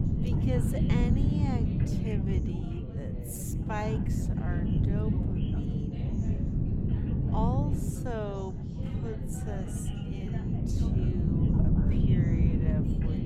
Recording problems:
wrong speed, natural pitch; too slow; 0.5 times normal speed
wind noise on the microphone; heavy; 2 dB above the speech
background chatter; loud; throughout; 3 voices, 9 dB below the speech

